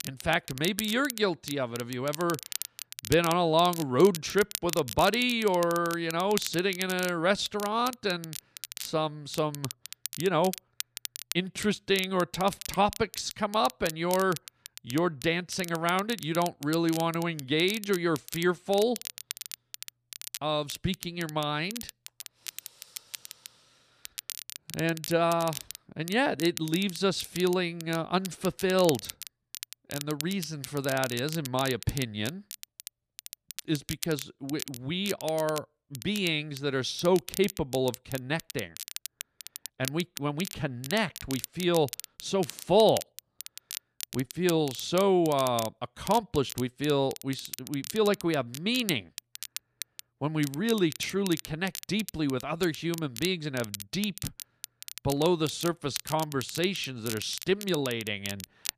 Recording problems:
crackle, like an old record; noticeable; 10 dB below the speech

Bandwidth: 14.5 kHz